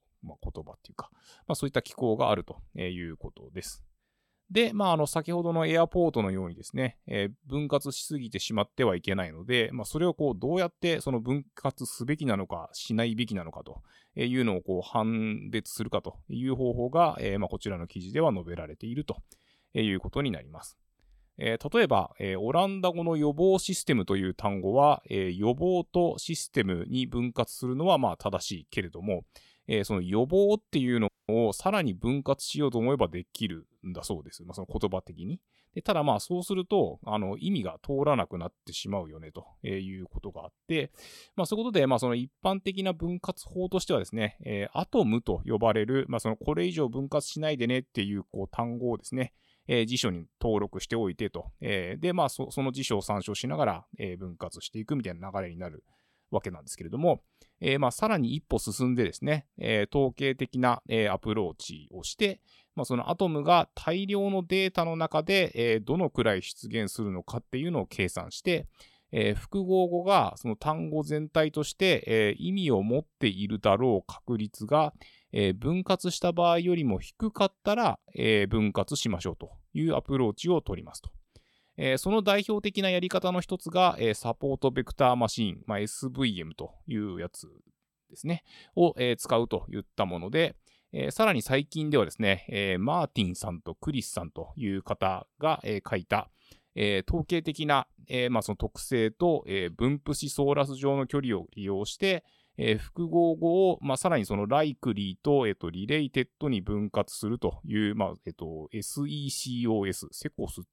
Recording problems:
audio cutting out; at 31 s

